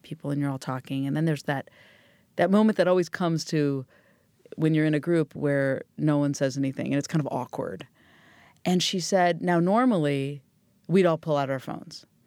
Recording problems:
none

